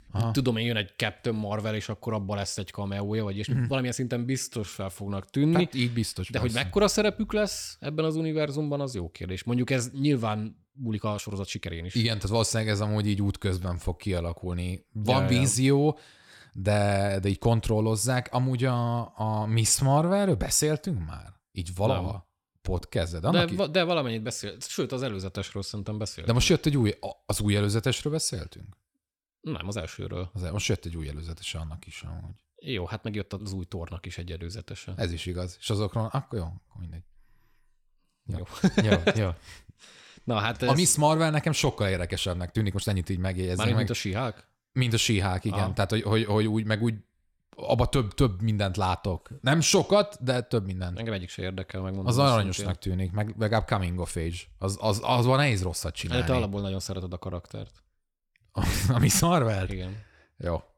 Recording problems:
uneven, jittery; strongly; from 3.5 to 59 s

